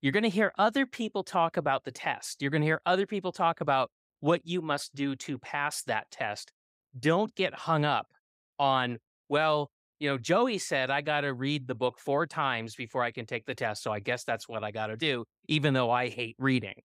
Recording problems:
none

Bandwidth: 15.5 kHz